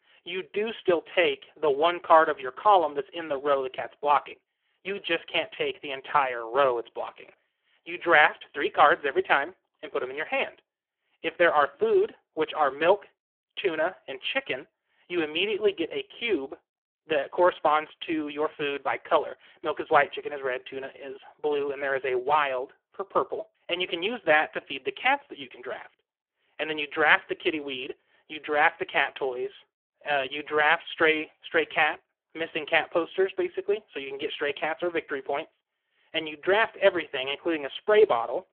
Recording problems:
phone-call audio; poor line; nothing above 3 kHz

